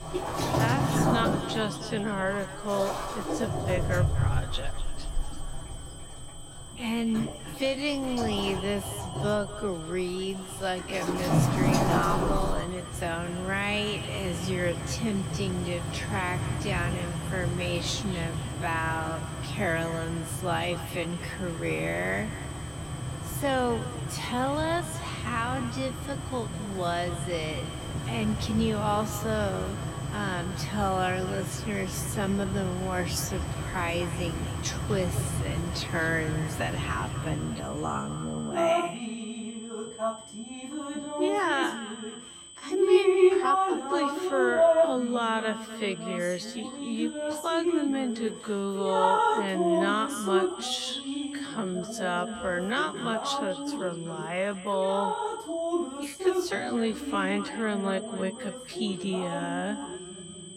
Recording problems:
wrong speed, natural pitch; too slow; 0.5 times normal speed
echo of what is said; noticeable; throughout; 250 ms later, 15 dB below the speech
rain or running water; loud; throughout; as loud as the speech
high-pitched whine; noticeable; throughout; 8 kHz, 15 dB below the speech

